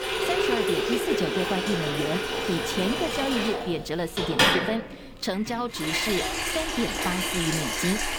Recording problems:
household noises; very loud; throughout; 4 dB above the speech

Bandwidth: 18 kHz